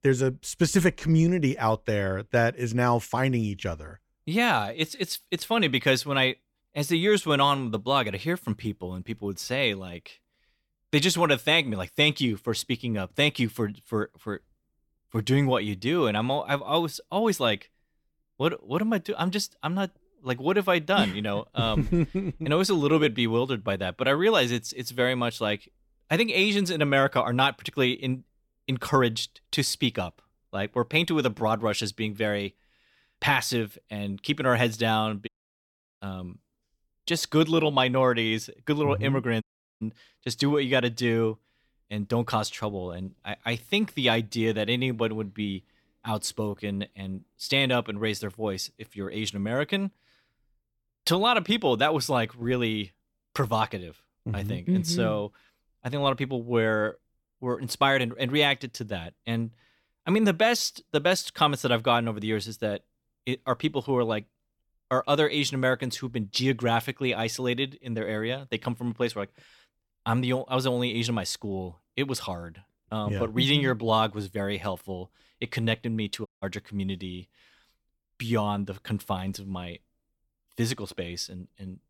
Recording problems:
audio cutting out; at 35 s for 0.5 s, at 39 s and at 1:16

